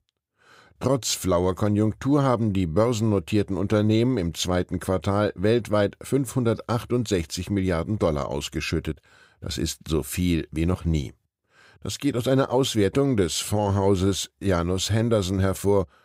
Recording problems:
none

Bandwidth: 15.5 kHz